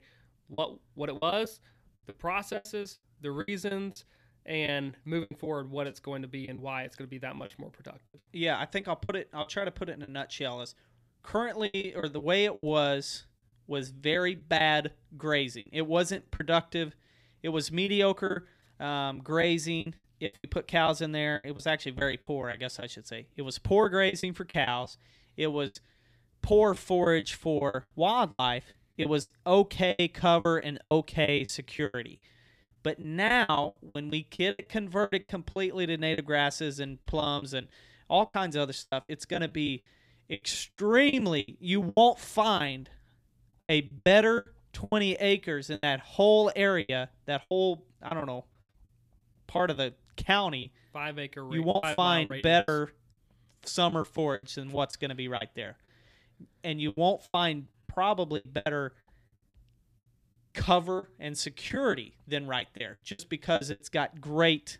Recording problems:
choppy; very; 12% of the speech affected

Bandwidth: 14.5 kHz